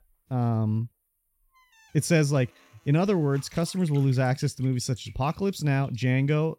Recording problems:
household noises; faint; throughout; 30 dB below the speech

